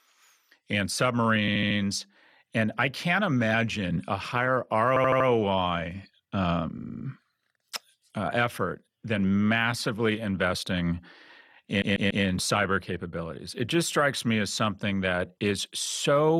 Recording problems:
audio stuttering; 4 times, first at 1.5 s
abrupt cut into speech; at the end

